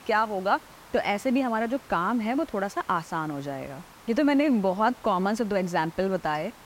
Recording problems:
hiss; faint; throughout; 20 dB below the speech

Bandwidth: 16 kHz